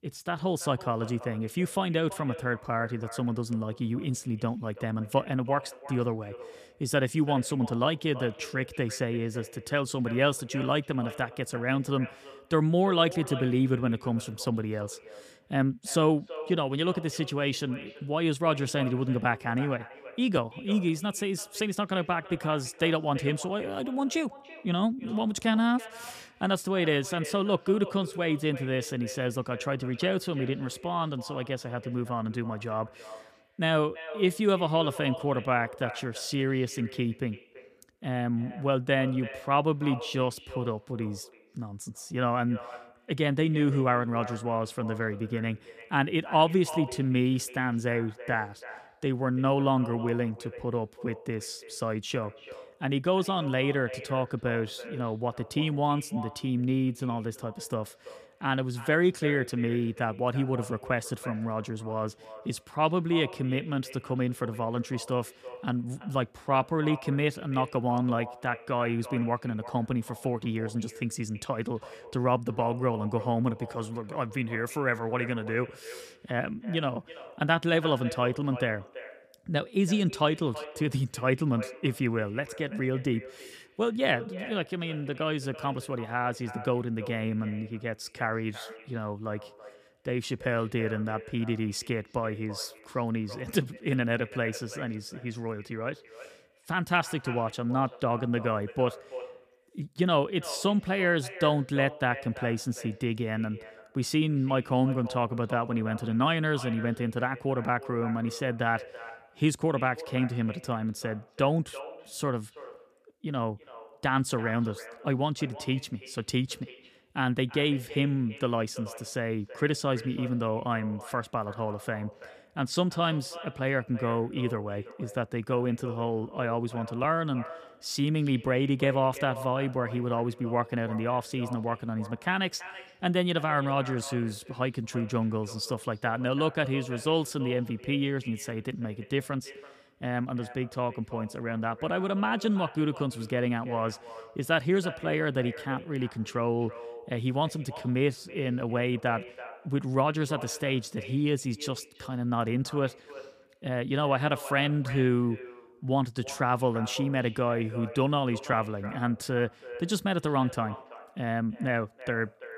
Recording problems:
echo of what is said; noticeable; throughout; 330 ms later, 15 dB below the speech

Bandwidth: 14.5 kHz